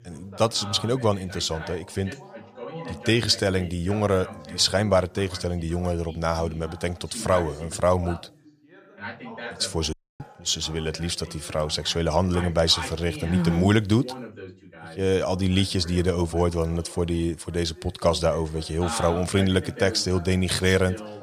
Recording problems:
background chatter; noticeable; throughout; 2 voices, 15 dB below the speech
audio cutting out; at 10 s

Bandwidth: 14.5 kHz